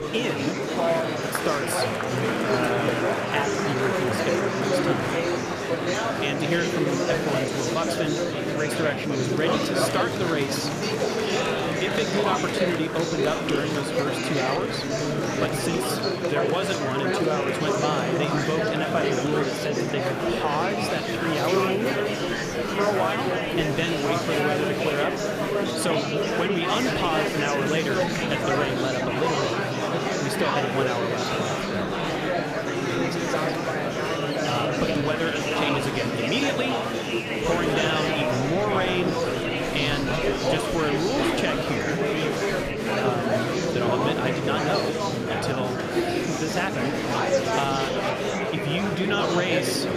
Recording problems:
murmuring crowd; very loud; throughout; 3 dB above the speech

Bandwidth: 14.5 kHz